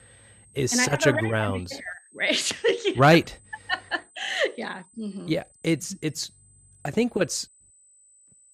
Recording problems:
high-pitched whine; faint; throughout; 8.5 kHz, 30 dB below the speech

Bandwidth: 14.5 kHz